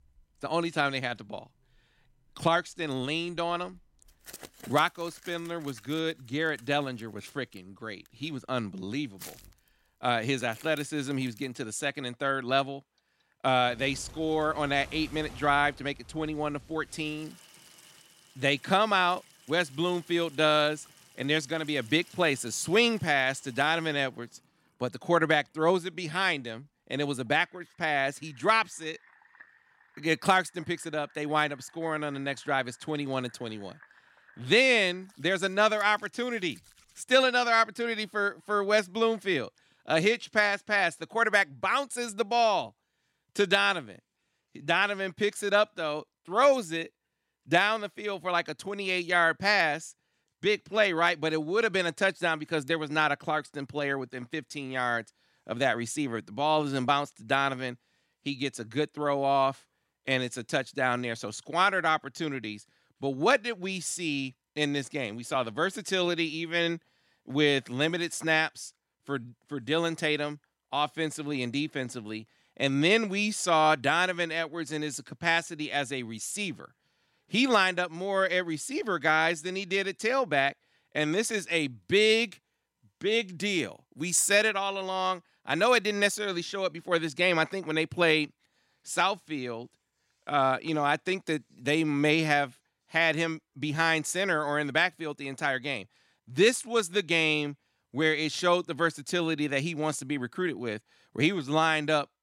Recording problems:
household noises; faint; until 37 s; 25 dB below the speech

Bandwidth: 16 kHz